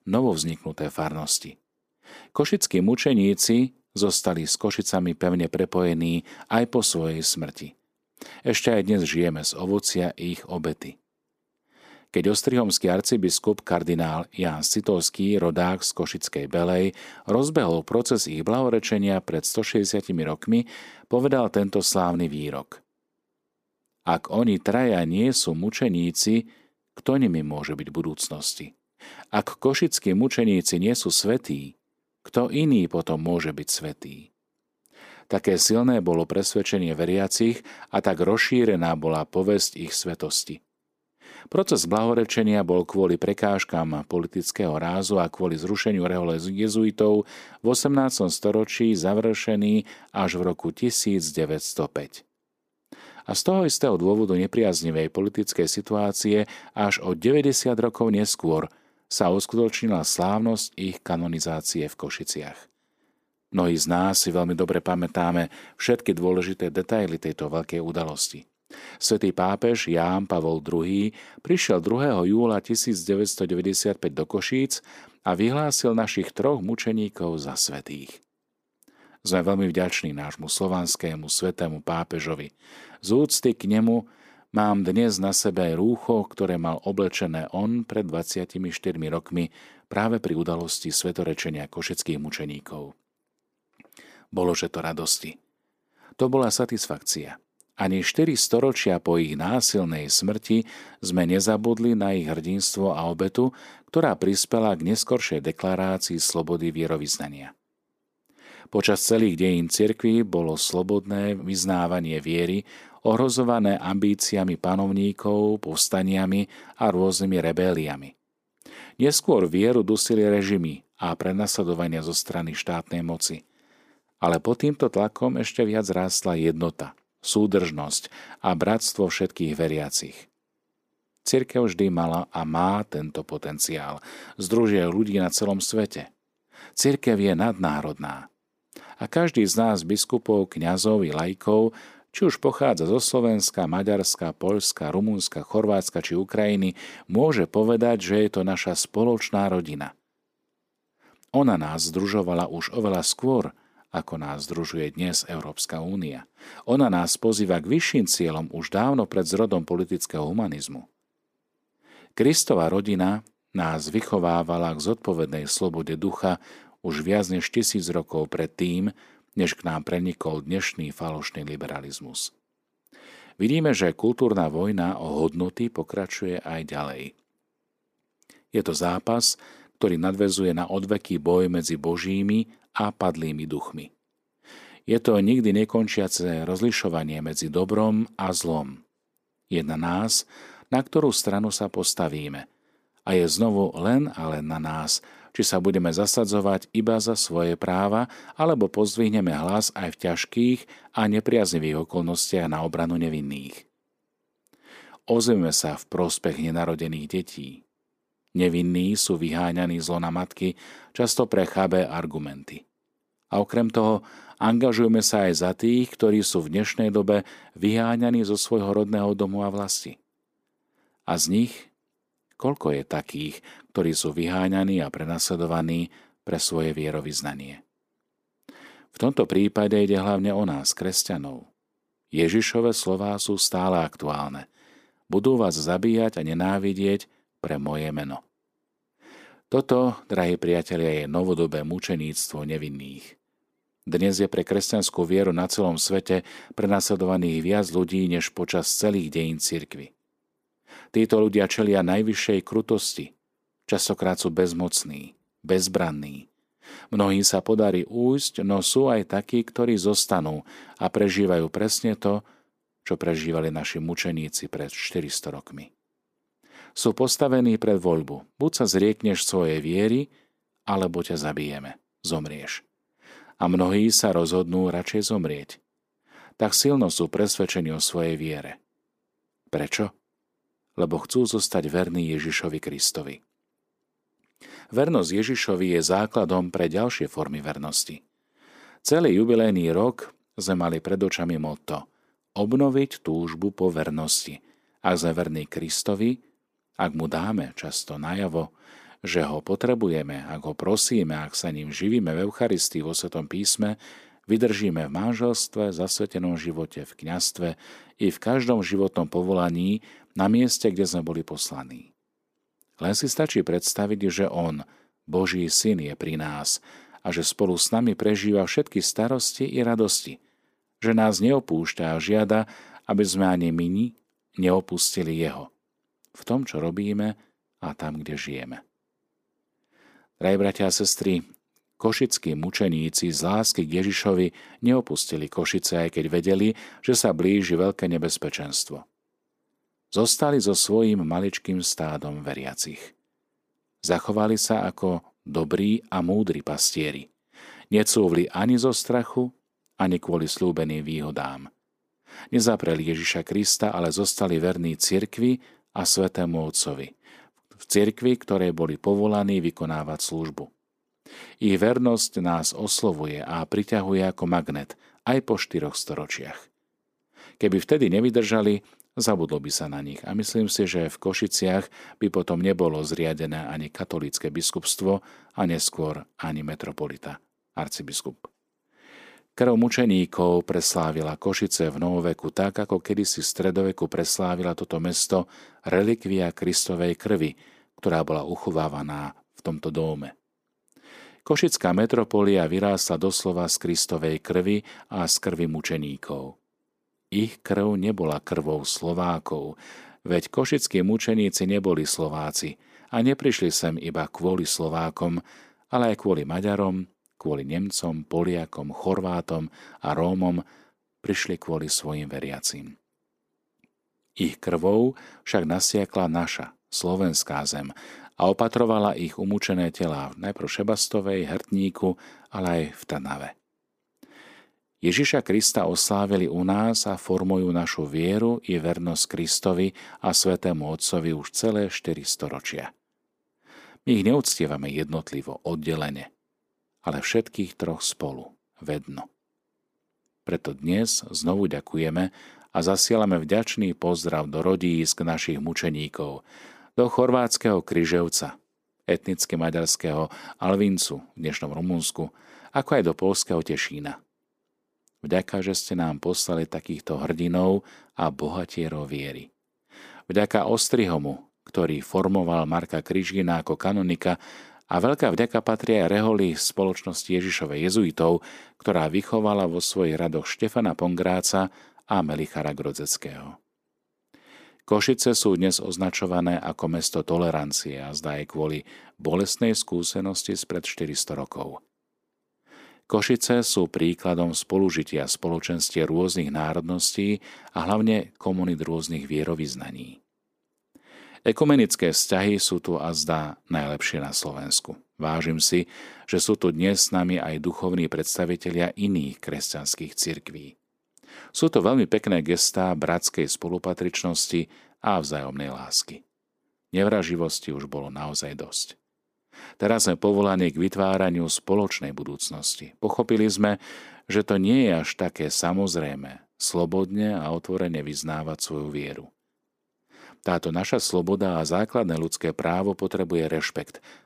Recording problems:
none

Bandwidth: 15 kHz